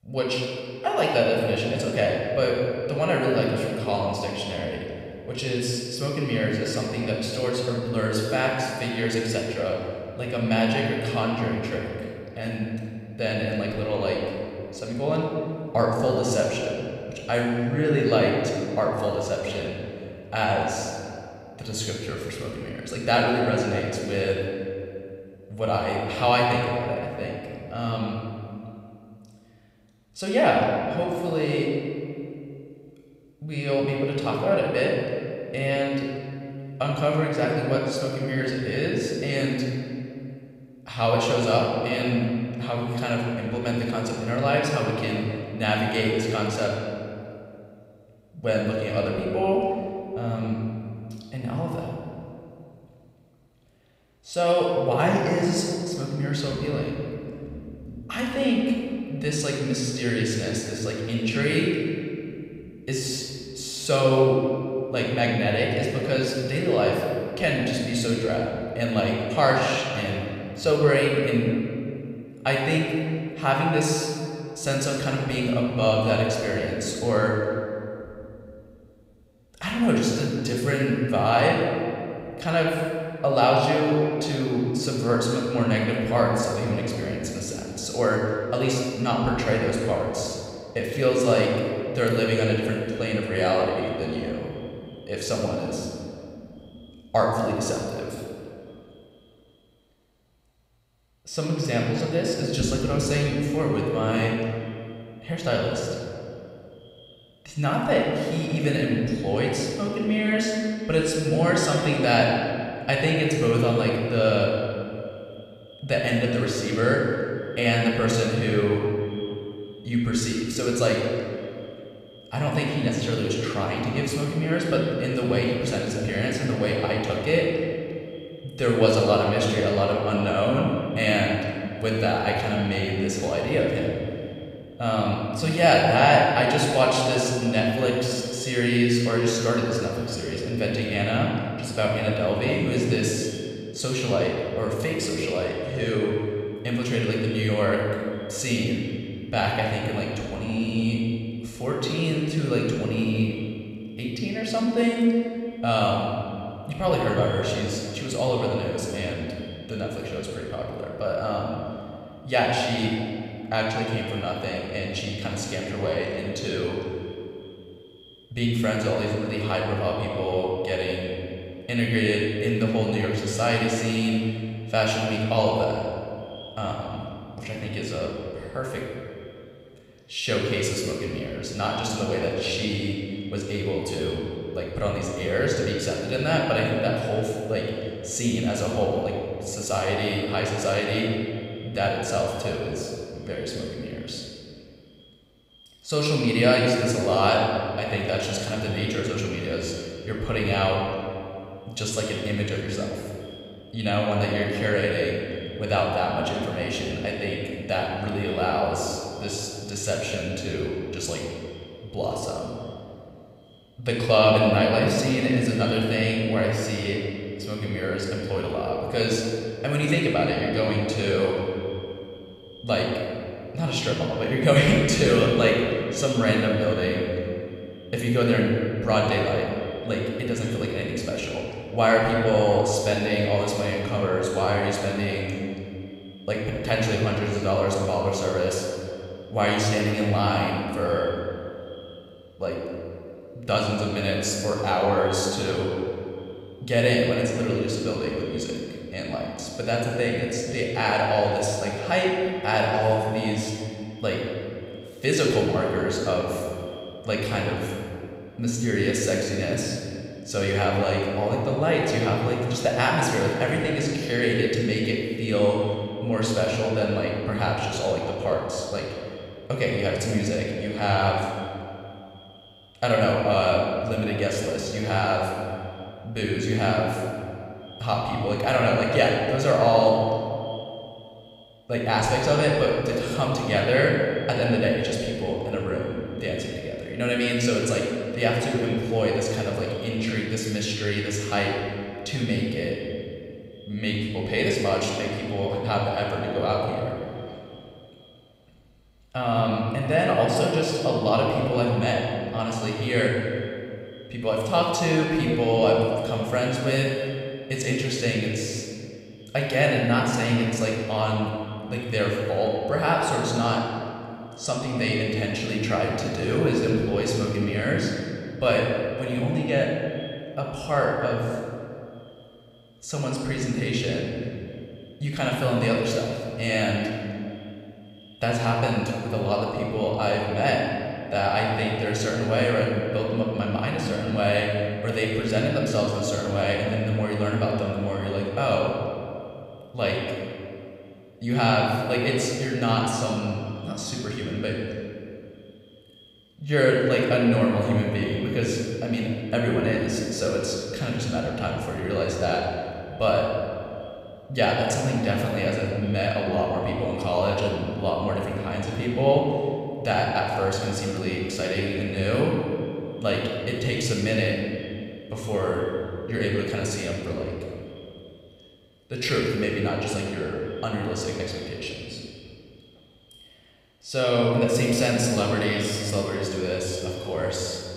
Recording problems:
room echo; noticeable; dies away in 2.1 s
echo of what is said; faint; from 1:32 on; 470 ms later, 25 dB below the speech
off-mic speech; somewhat distant

